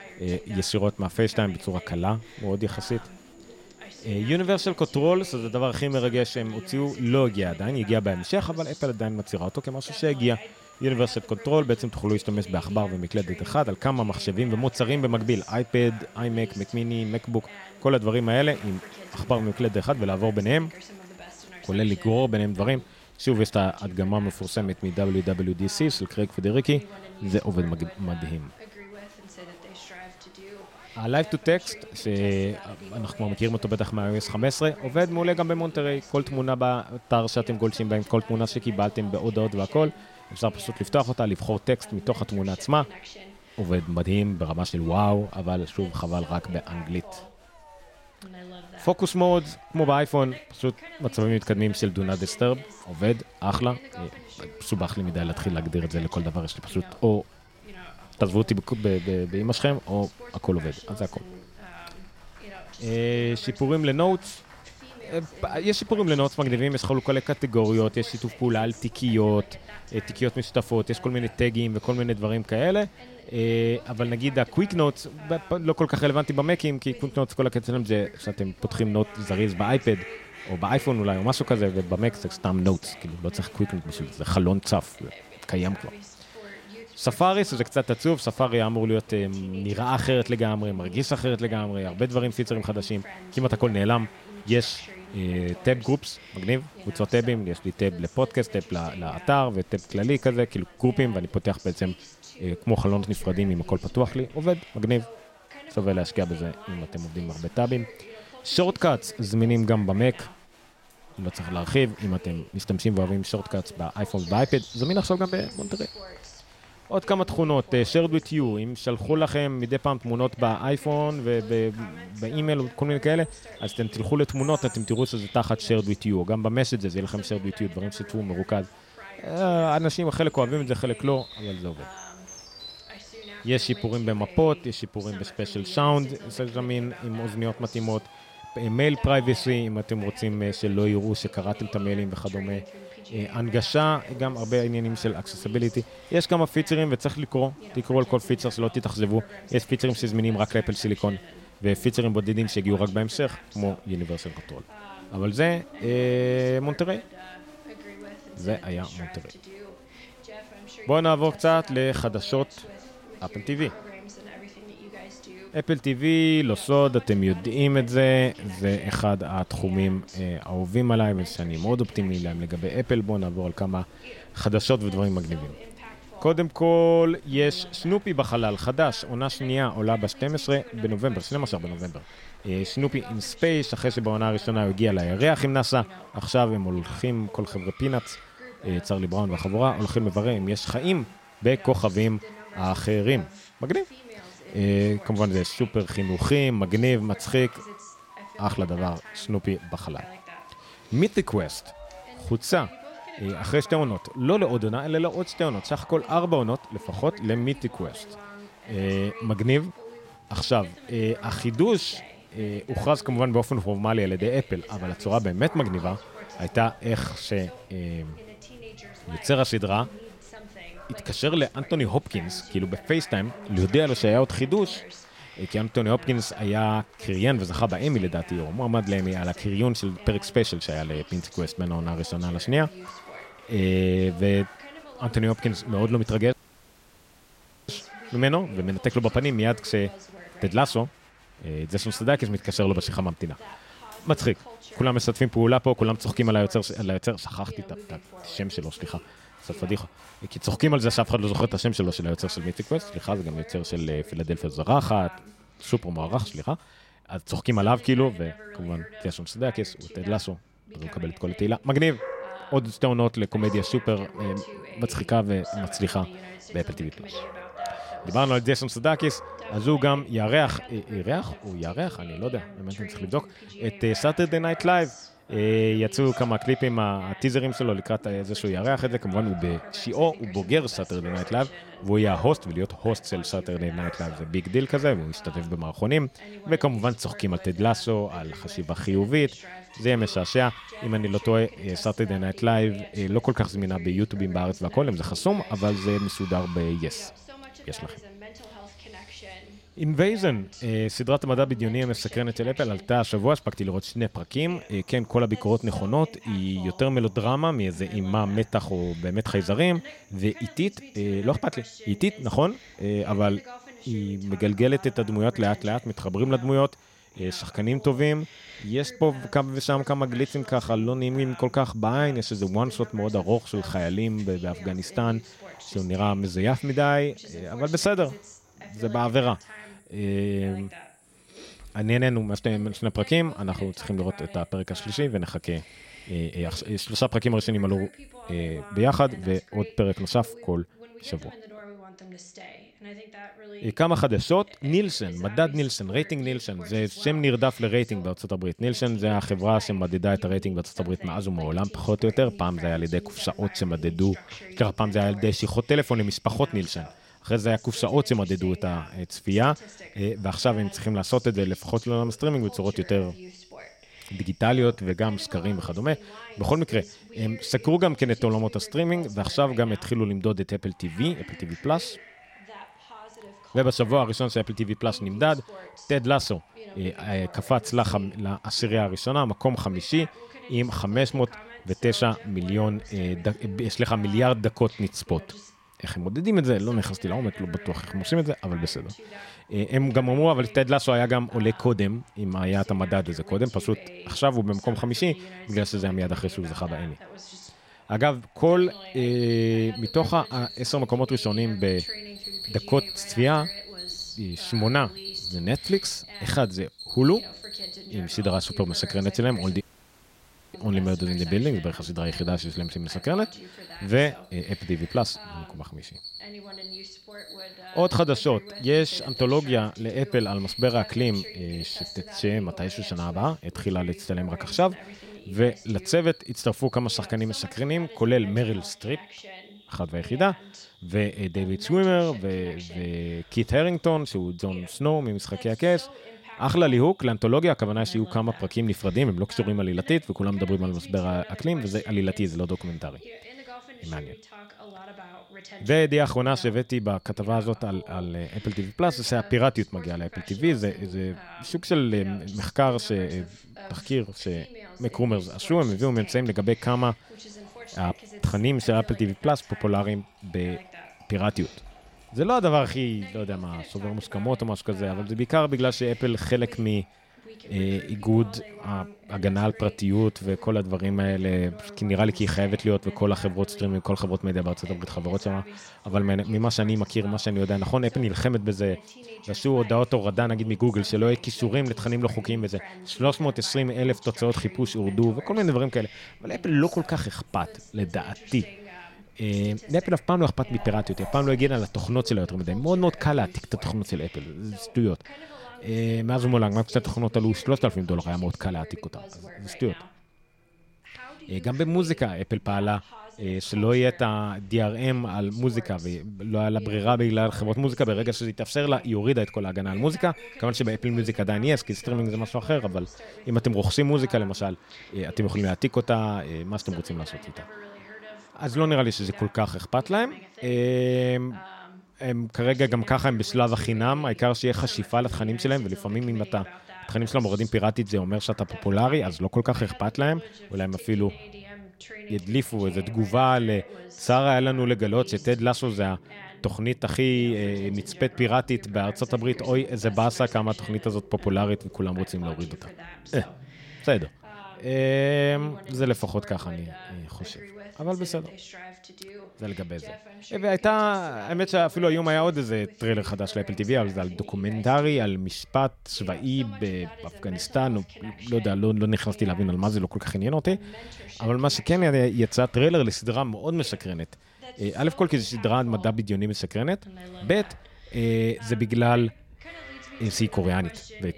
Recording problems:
voice in the background; noticeable; throughout; 20 dB below the speech
animal sounds; faint; throughout; 20 dB below the speech
crowd noise; faint; until 4:07; 25 dB below the speech
audio cutting out; at 3:56 for 1.5 s and at 6:50 for 1 s

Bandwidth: 16 kHz